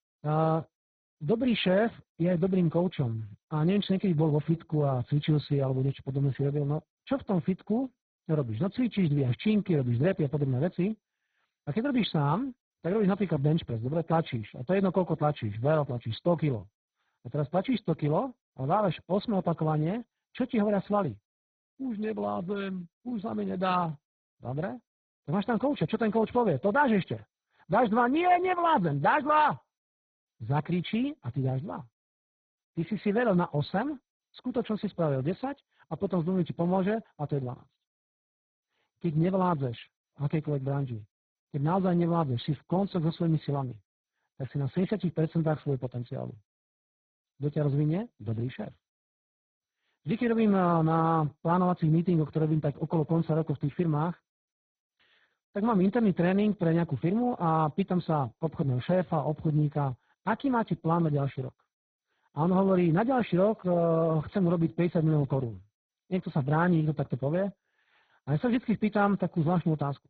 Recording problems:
garbled, watery; badly; nothing above 4 kHz

